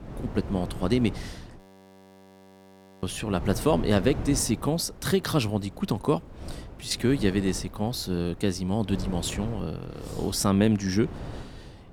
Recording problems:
wind noise on the microphone; occasional gusts; 15 dB below the speech
audio freezing; at 1.5 s for 1.5 s

